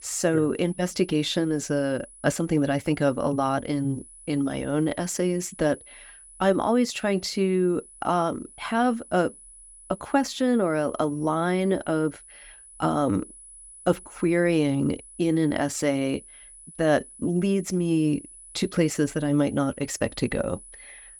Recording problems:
high-pitched whine; noticeable; throughout; 10 kHz, 20 dB below the speech

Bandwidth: 17.5 kHz